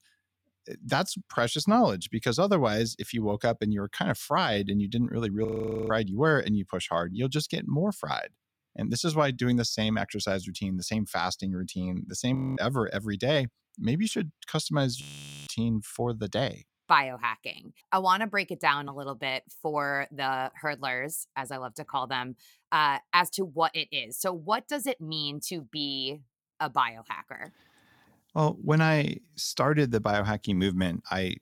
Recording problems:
audio freezing; at 5.5 s, at 12 s and at 15 s

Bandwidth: 17 kHz